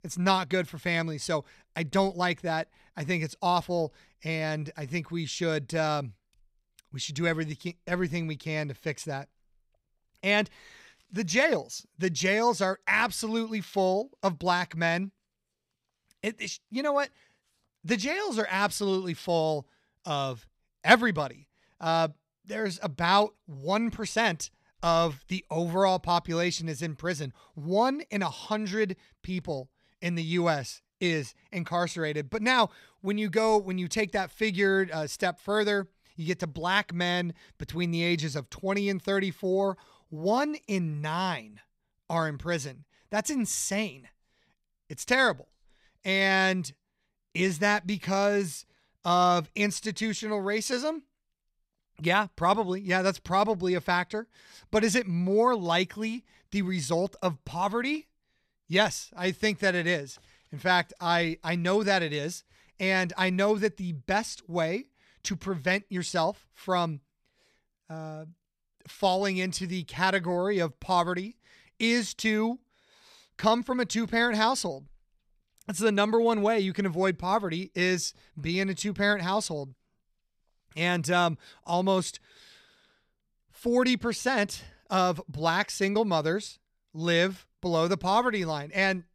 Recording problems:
none

